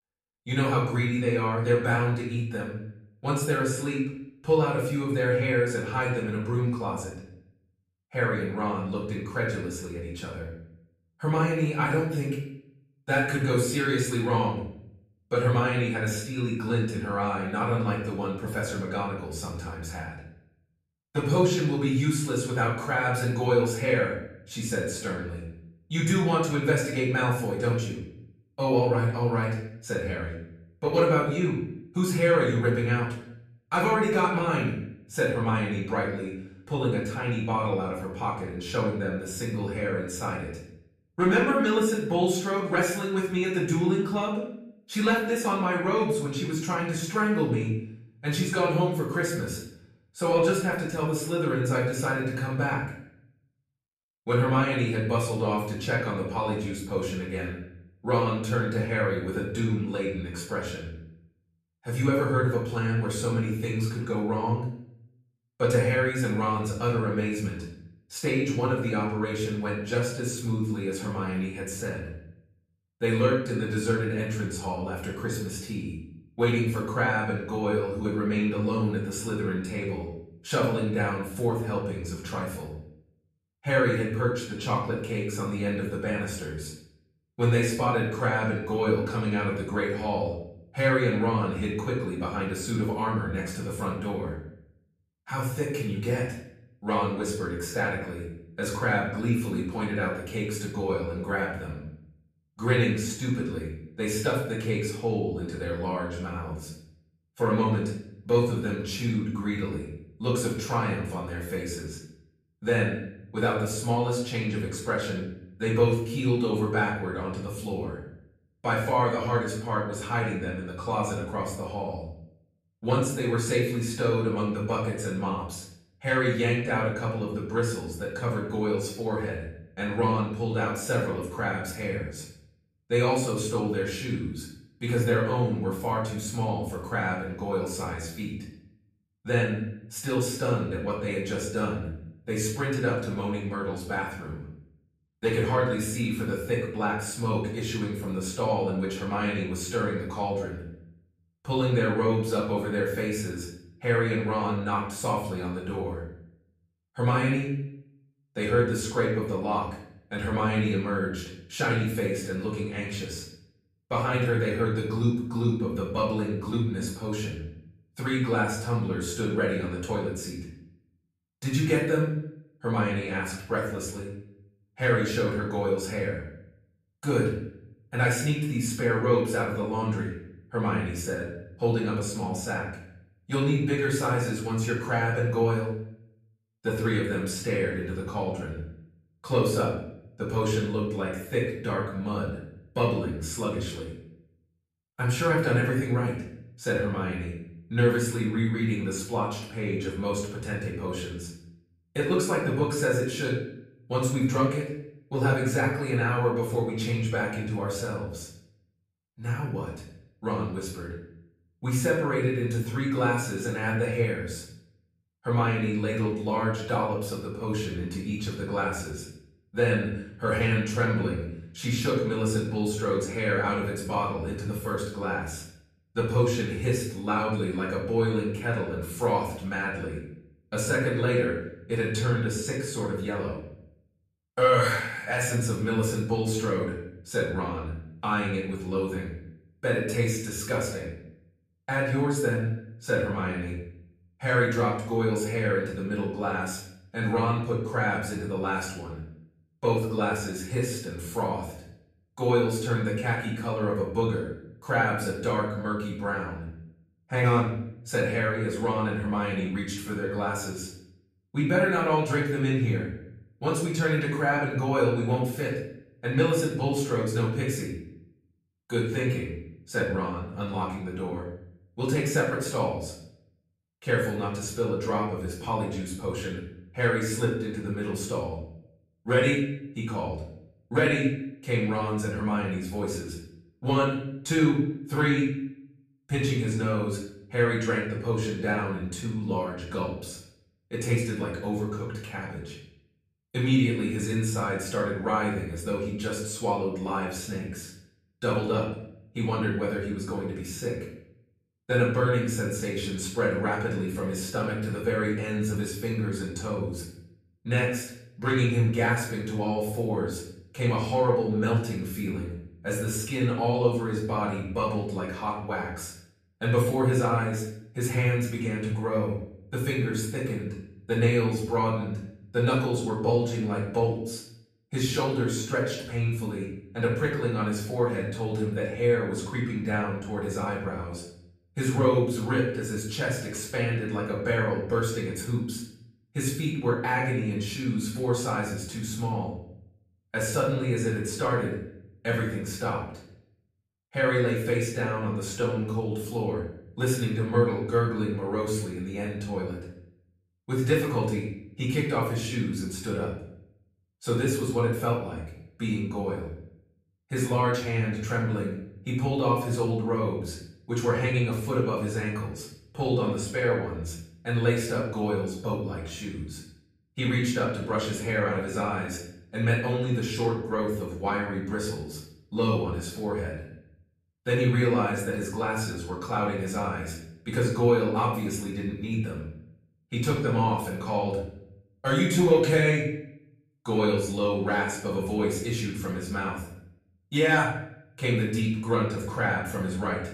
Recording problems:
off-mic speech; far
room echo; noticeable; dies away in 0.6 s

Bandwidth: 14.5 kHz